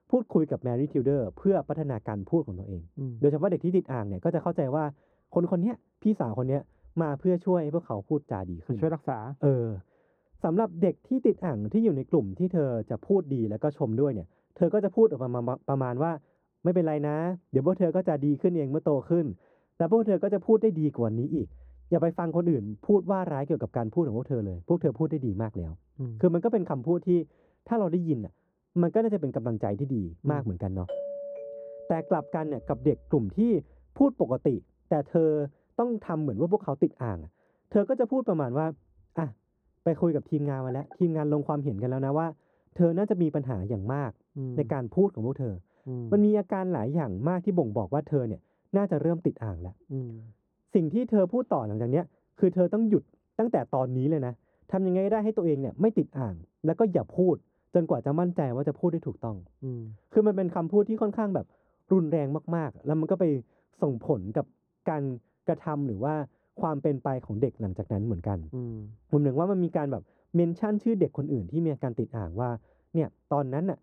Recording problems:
muffled; very; fading above 1.5 kHz
doorbell; noticeable; from 31 to 33 s; peak 7 dB below the speech

